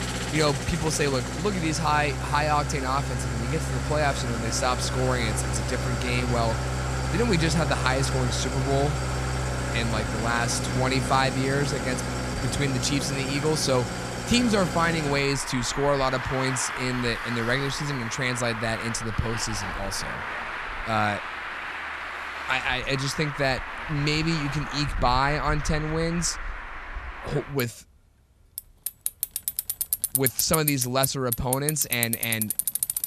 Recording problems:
traffic noise; loud; throughout; 3 dB below the speech

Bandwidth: 14.5 kHz